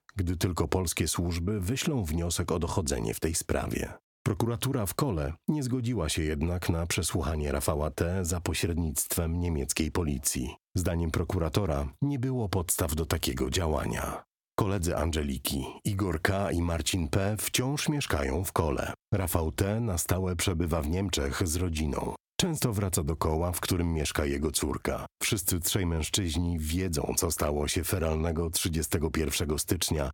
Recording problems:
squashed, flat; heavily

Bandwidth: 17 kHz